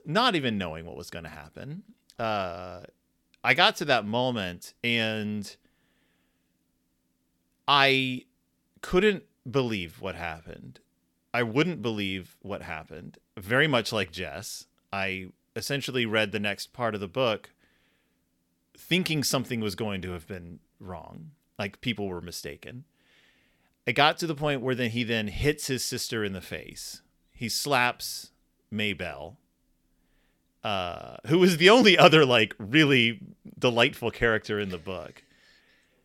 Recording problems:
none

